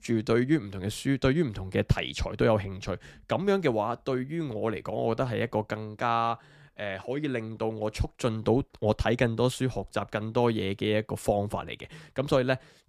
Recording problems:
none

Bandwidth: 15 kHz